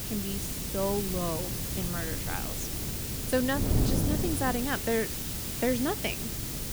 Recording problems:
wind noise on the microphone; heavy; 10 dB below the speech
hiss; loud; throughout; 1 dB below the speech

